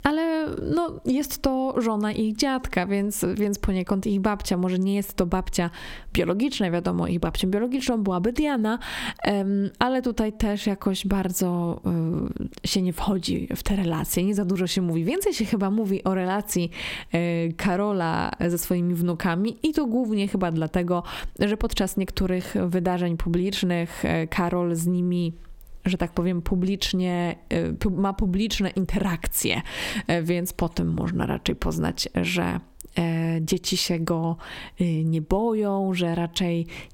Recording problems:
squashed, flat; somewhat

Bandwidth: 16.5 kHz